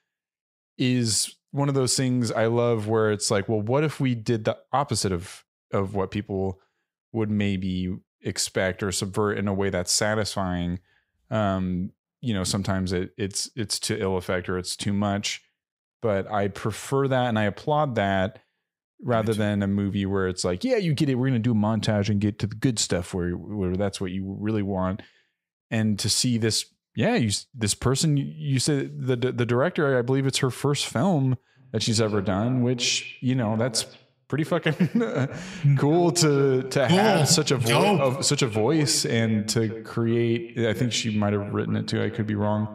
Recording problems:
echo of what is said; noticeable; from 32 s on; 130 ms later, 15 dB below the speech

